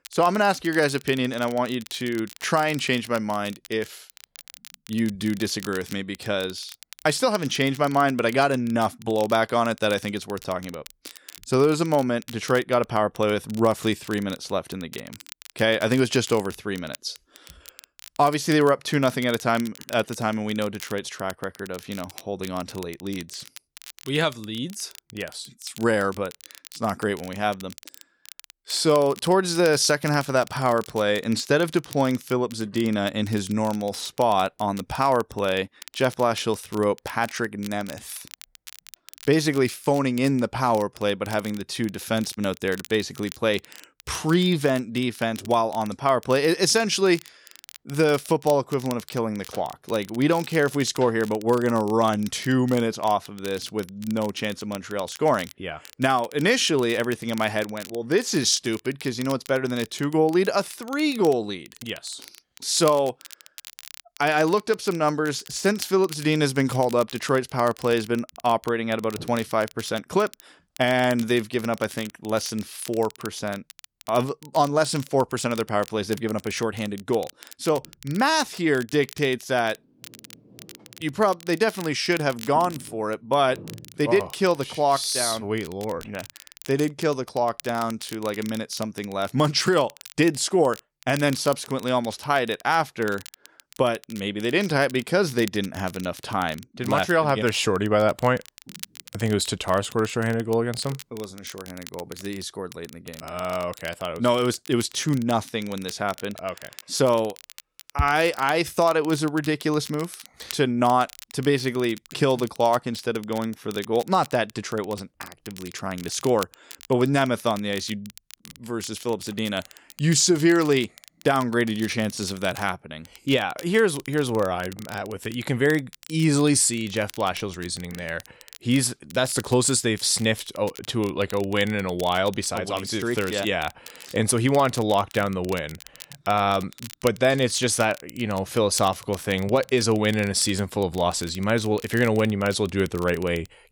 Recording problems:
crackle, like an old record; noticeable; 20 dB below the speech

